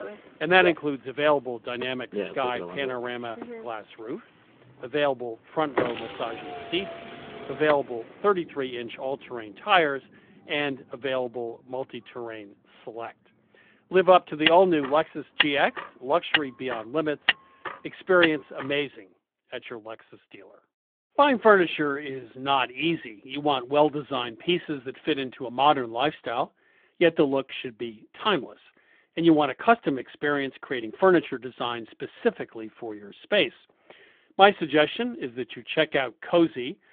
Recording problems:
phone-call audio; nothing above 3.5 kHz
traffic noise; loud; until 19 s; 6 dB below the speech

